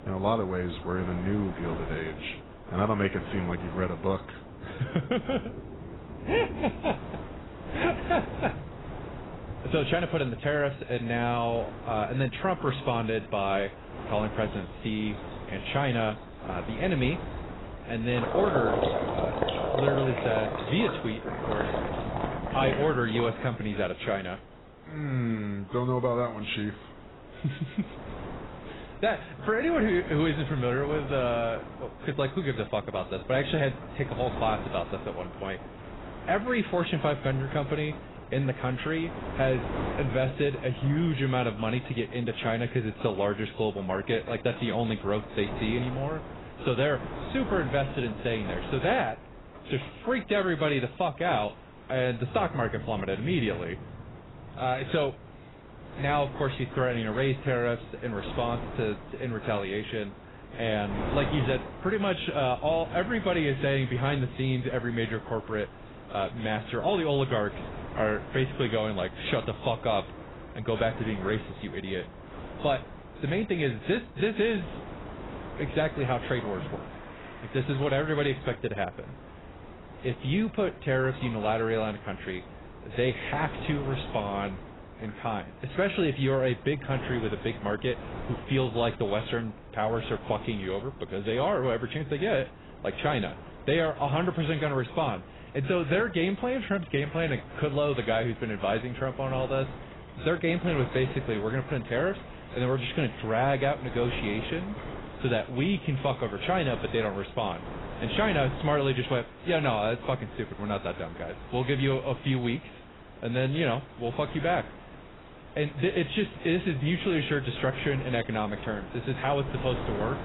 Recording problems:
garbled, watery; badly; nothing above 4 kHz
rain or running water; noticeable; throughout; 10 dB below the speech
wind noise on the microphone; occasional gusts; 15 dB below the speech

